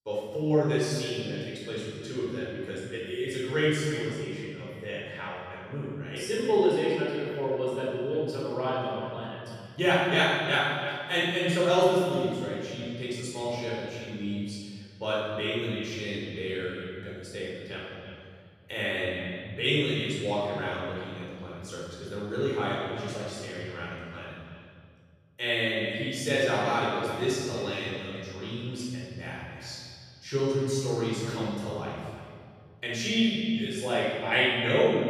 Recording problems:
room echo; strong; dies away in 2.1 s
off-mic speech; far
echo of what is said; noticeable; throughout; 330 ms later, 15 dB below the speech

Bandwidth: 14.5 kHz